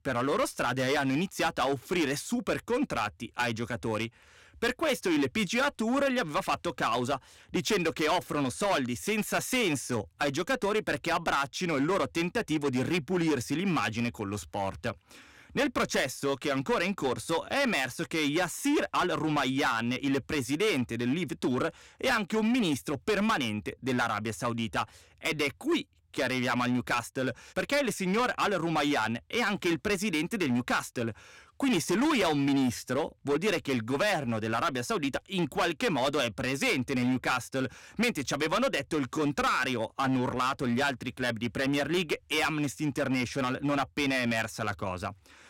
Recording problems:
distortion; heavy; 11% of the sound clipped

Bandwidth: 16.5 kHz